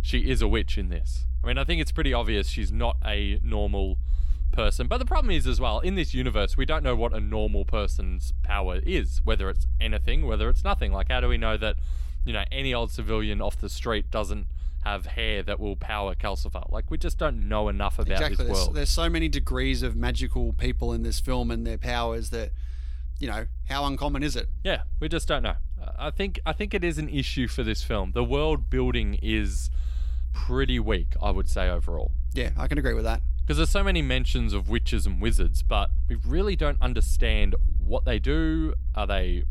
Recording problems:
low rumble; faint; throughout; 20 dB below the speech

